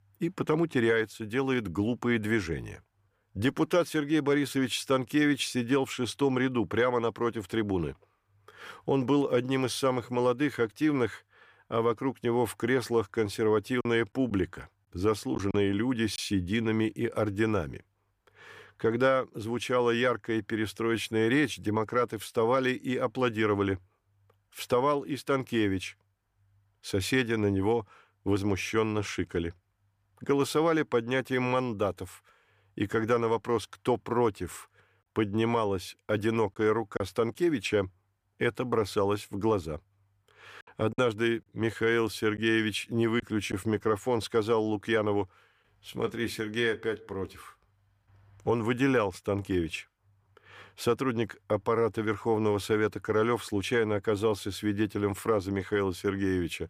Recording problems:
choppy; occasionally; from 14 to 16 s, at 37 s and from 41 to 44 s; 3% of the speech affected

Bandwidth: 15 kHz